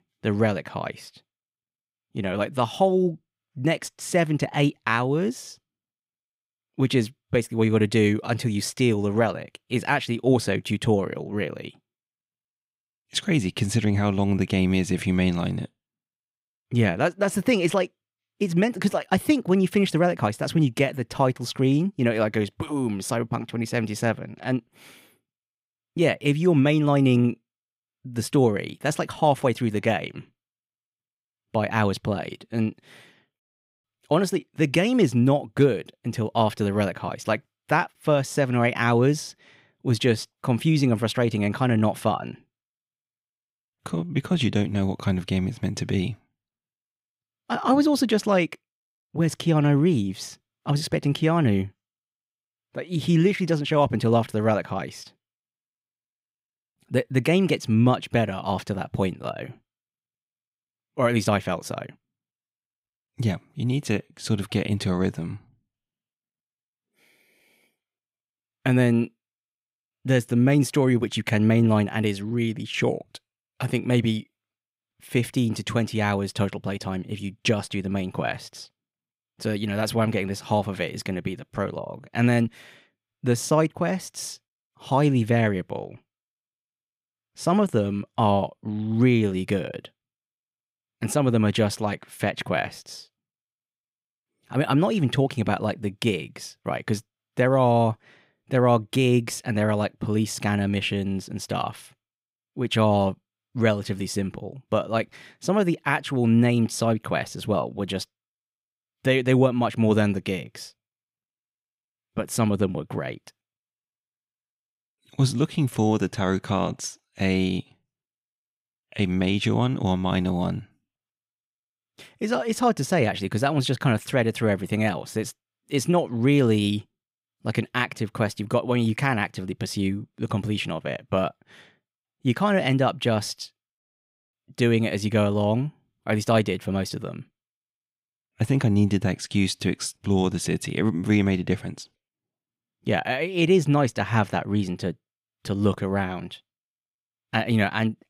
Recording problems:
none

